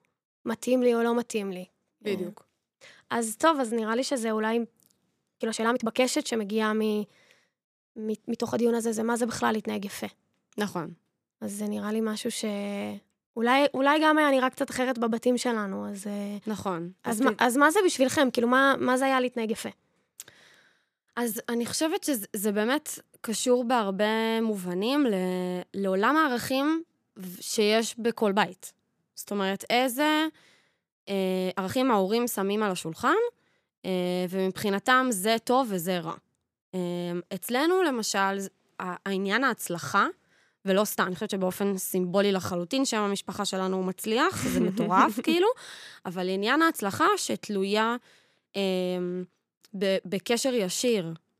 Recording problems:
uneven, jittery; strongly; from 3.5 to 50 s

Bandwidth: 14.5 kHz